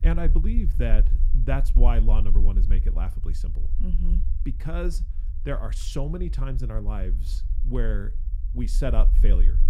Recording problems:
low rumble; noticeable; throughout; 15 dB below the speech

